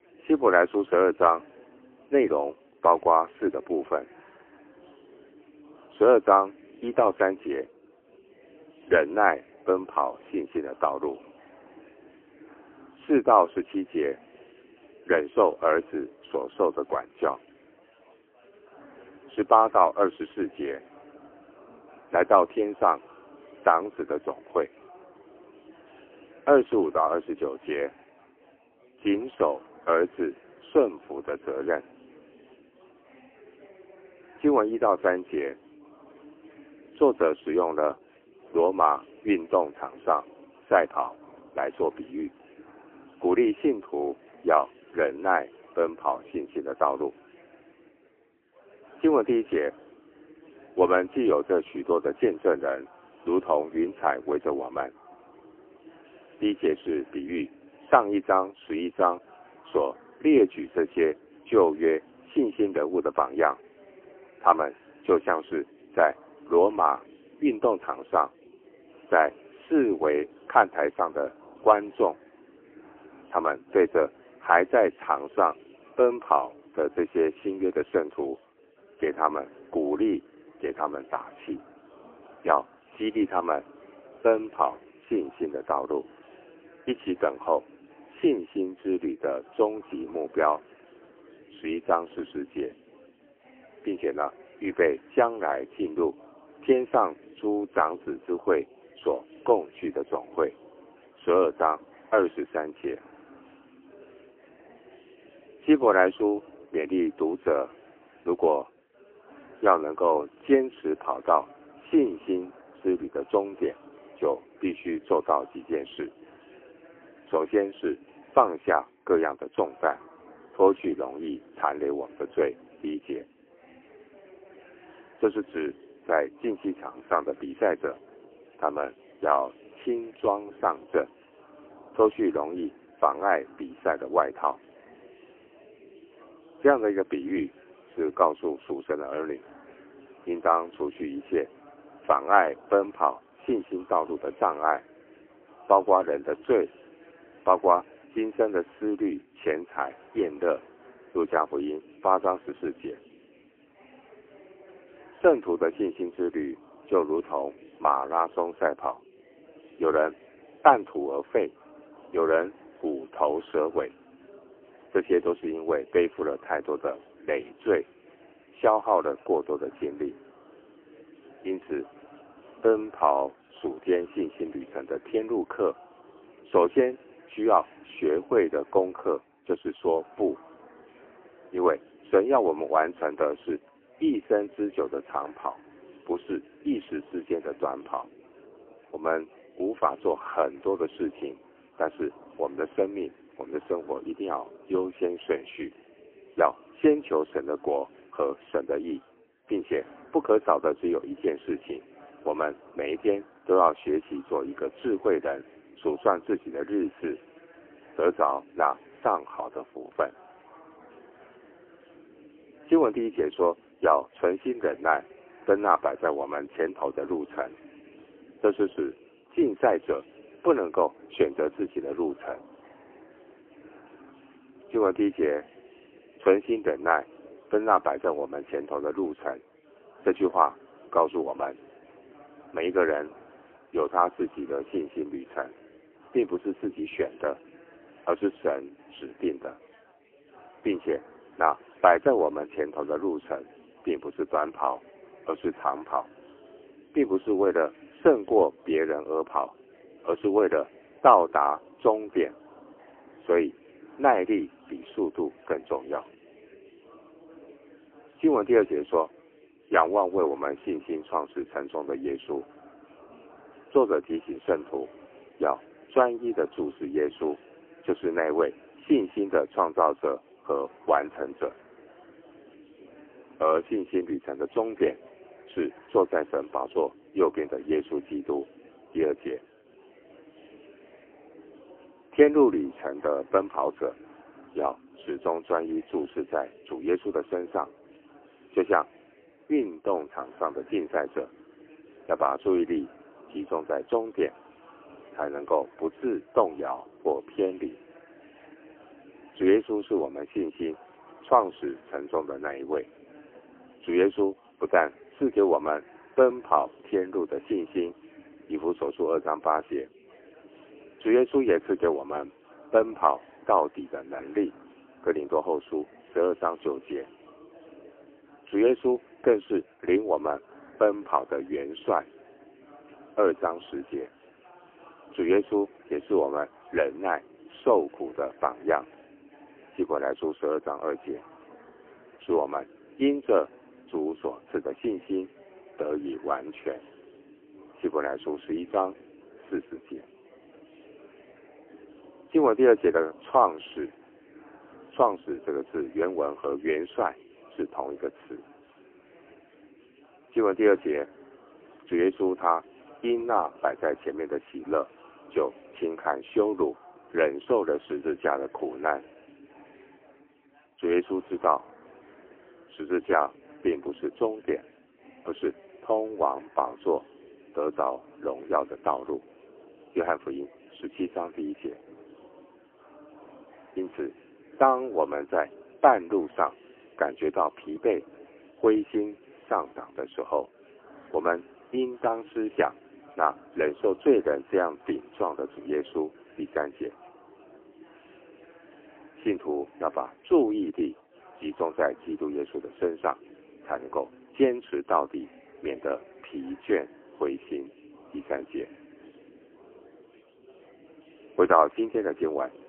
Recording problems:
phone-call audio; poor line; nothing above 3 kHz
chatter from many people; faint; throughout; 25 dB below the speech

